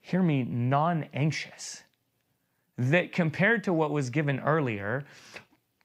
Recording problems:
none

